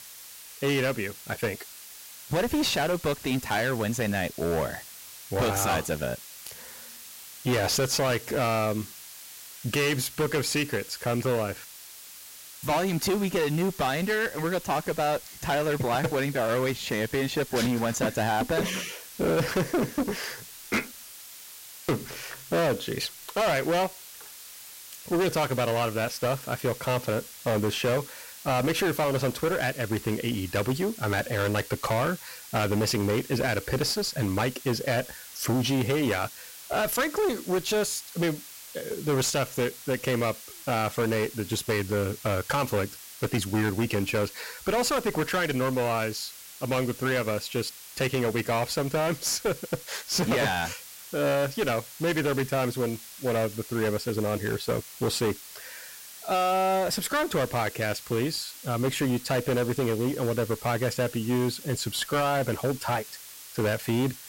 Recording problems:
distortion; heavy; 16% of the sound clipped
hiss; noticeable; throughout; 15 dB below the speech

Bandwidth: 16 kHz